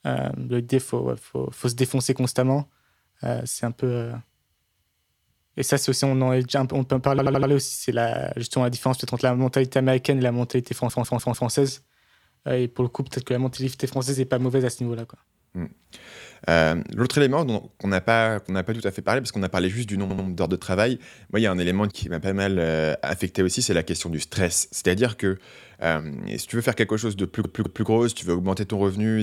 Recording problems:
audio stuttering; 4 times, first at 7 s
abrupt cut into speech; at the end

